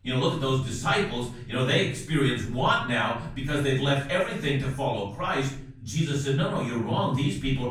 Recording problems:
off-mic speech; far
room echo; noticeable; dies away in 0.6 s

